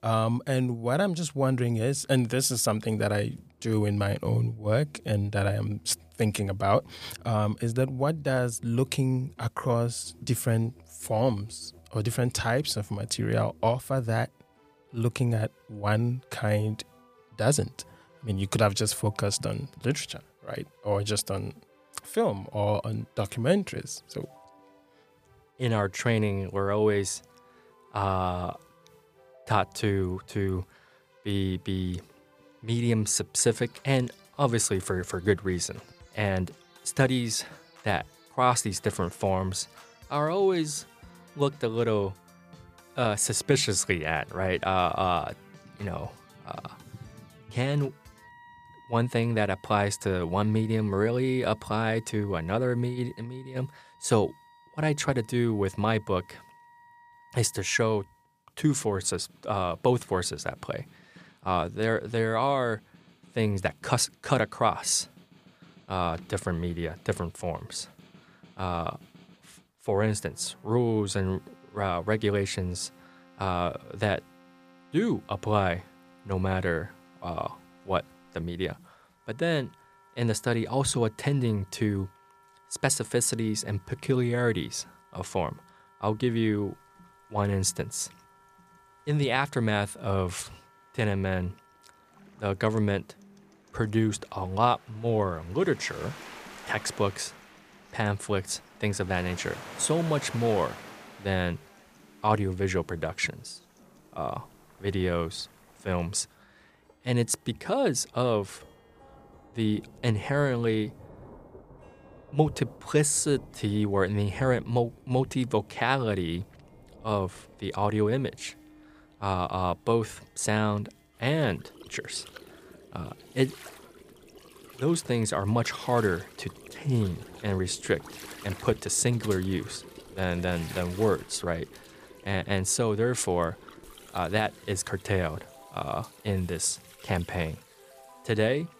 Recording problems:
background music; faint; throughout; 30 dB below the speech
rain or running water; faint; throughout; 20 dB below the speech

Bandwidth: 15 kHz